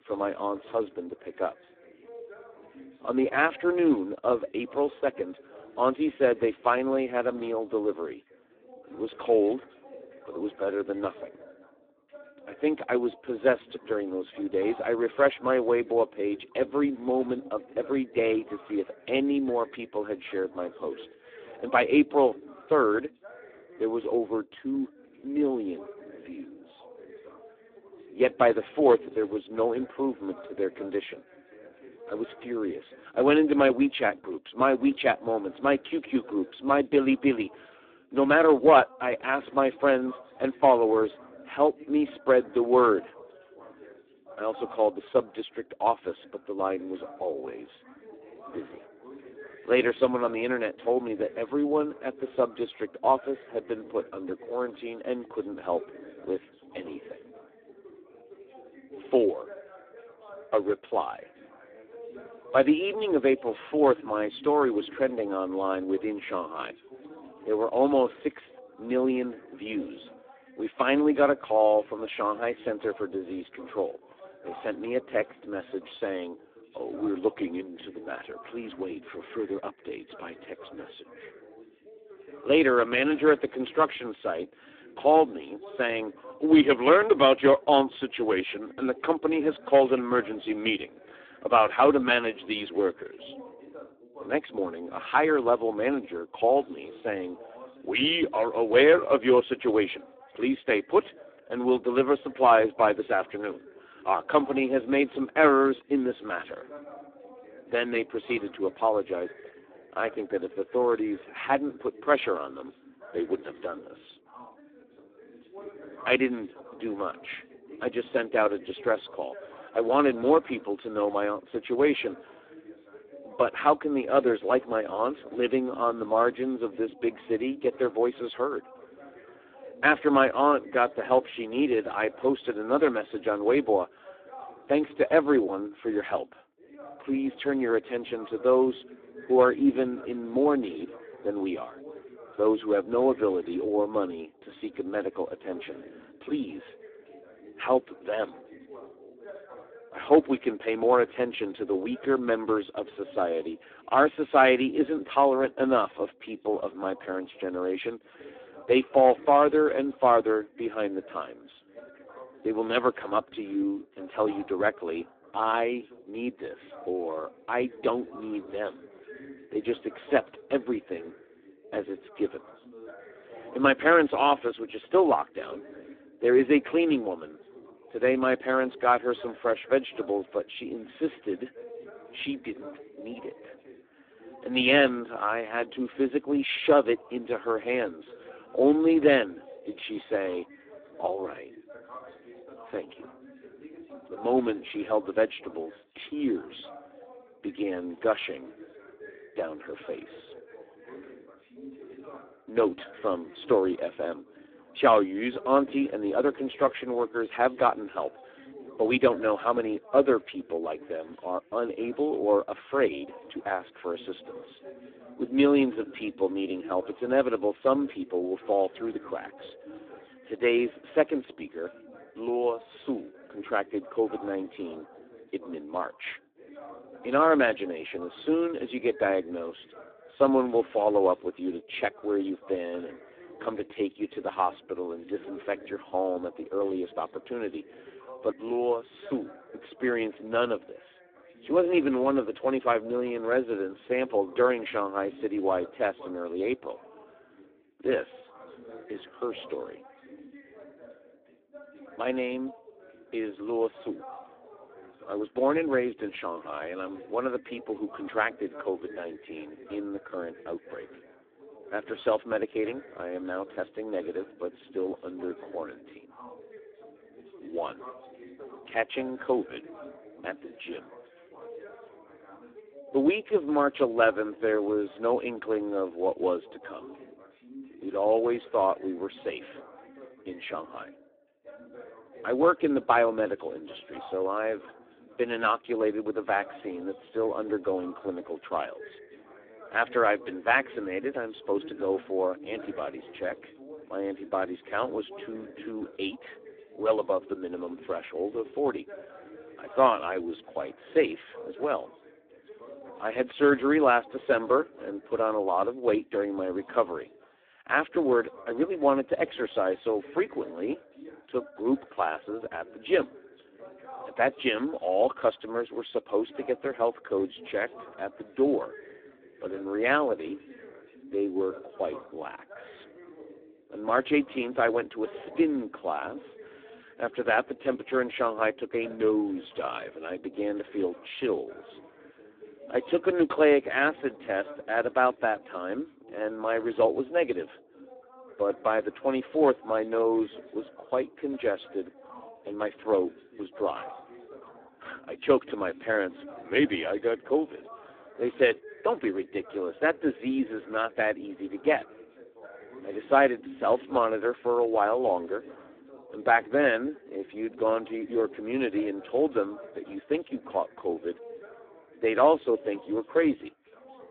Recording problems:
phone-call audio; poor line
background chatter; faint; throughout; 2 voices, 20 dB below the speech

